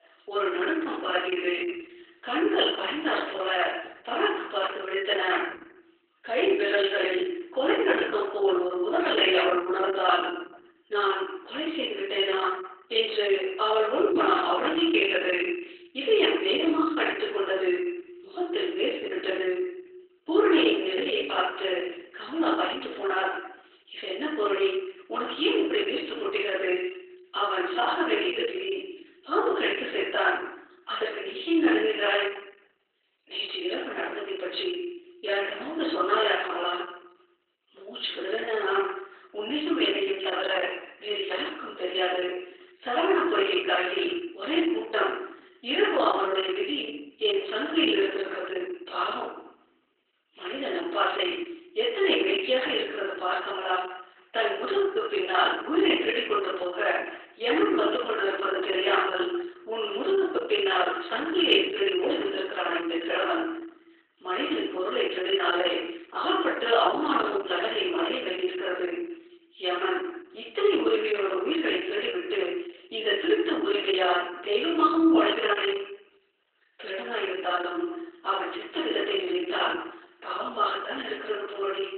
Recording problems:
off-mic speech; far
garbled, watery; badly
thin; very; fading below 350 Hz
room echo; noticeable; dies away in 0.7 s

